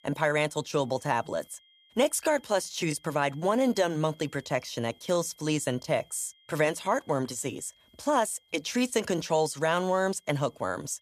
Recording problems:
high-pitched whine; faint; throughout; 3 kHz, 30 dB below the speech

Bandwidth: 14.5 kHz